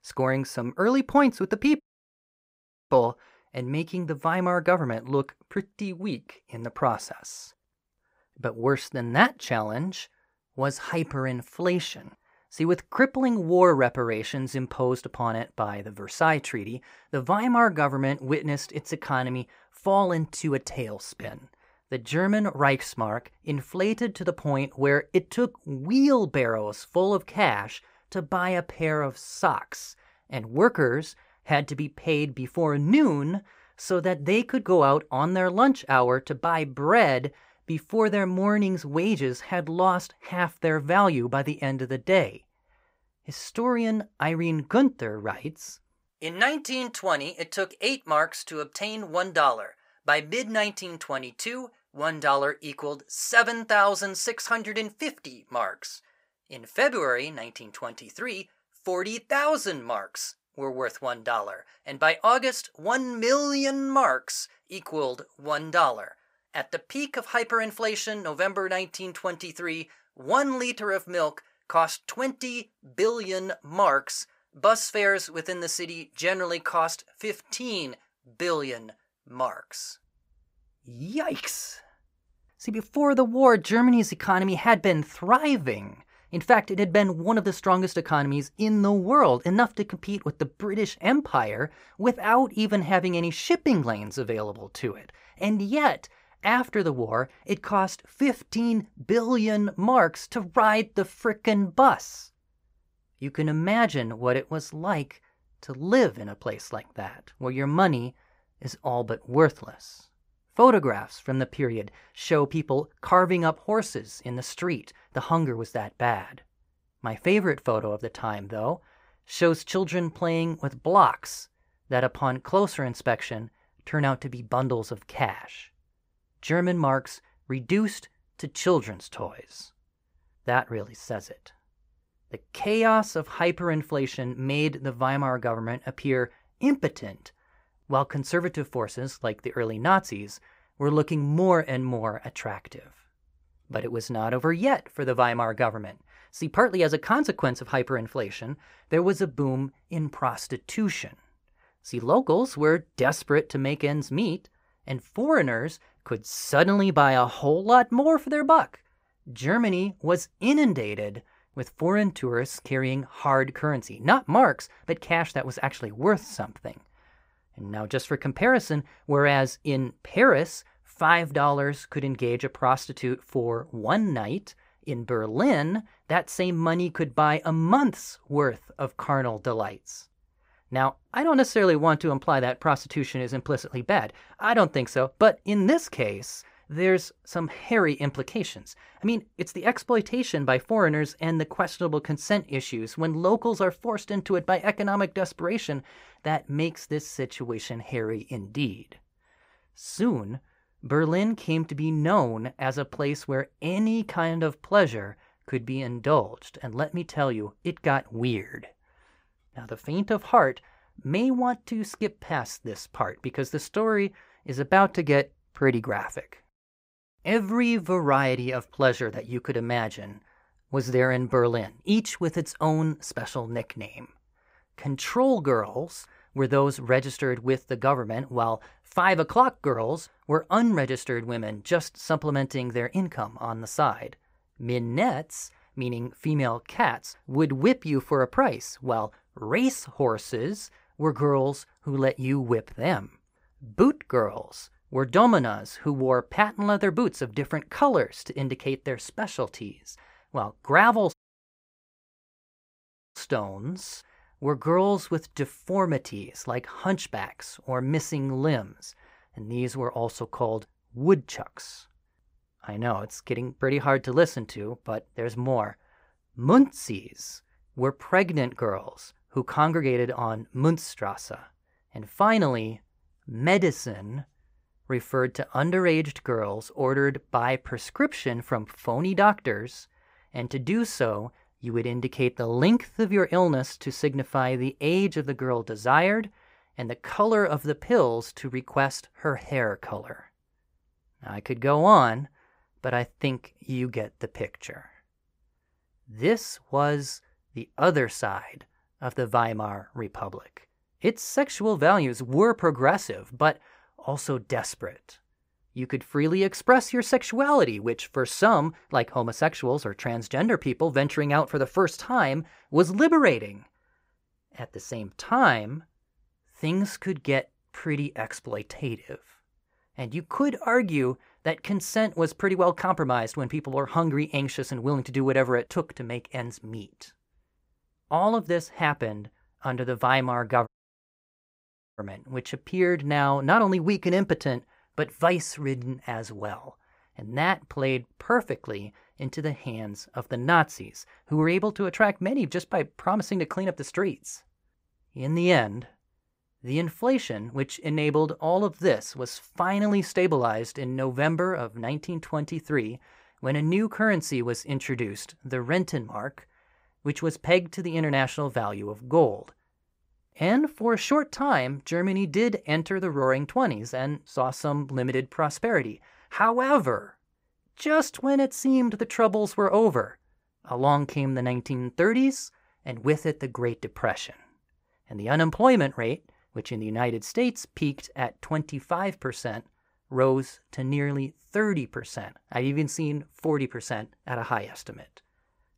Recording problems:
audio cutting out; at 2 s for 1 s, at 4:11 for 2 s and at 5:31 for 1.5 s

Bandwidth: 15.5 kHz